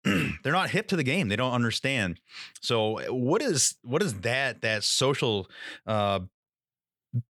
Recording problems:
none

